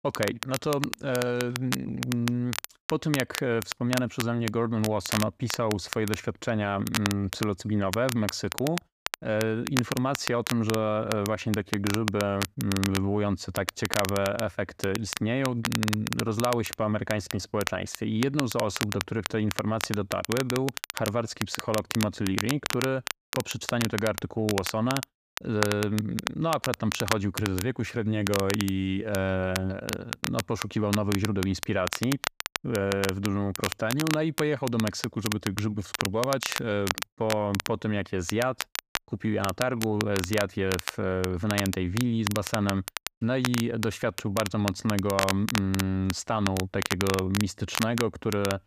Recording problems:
crackle, like an old record; loud; 5 dB below the speech

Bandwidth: 14.5 kHz